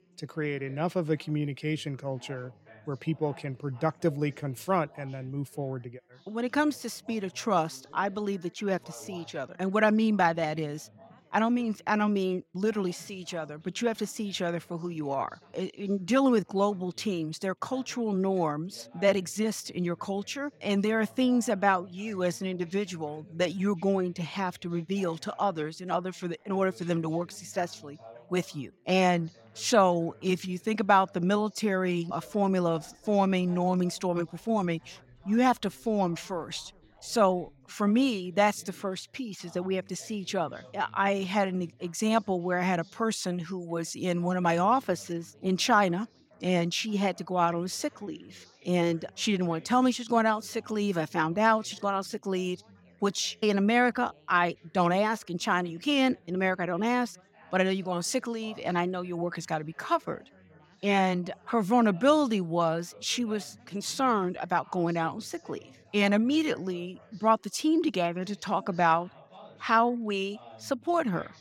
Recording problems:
background chatter; faint; throughout; 4 voices, 25 dB below the speech

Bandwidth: 16.5 kHz